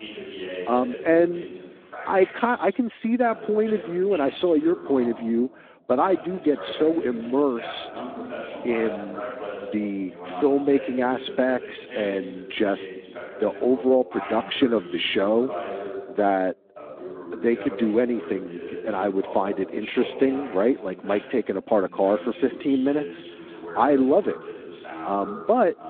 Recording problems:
phone-call audio; nothing above 3.5 kHz
voice in the background; noticeable; throughout; 10 dB below the speech

